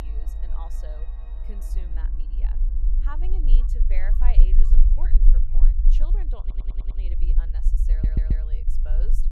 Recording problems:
echo of what is said; faint; throughout; 520 ms later, 20 dB below the speech
background music; loud; until 3.5 s; 8 dB below the speech
low rumble; loud; throughout; 2 dB below the speech
abrupt cut into speech; at the start
audio stuttering; at 6.5 s and at 8 s

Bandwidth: 14.5 kHz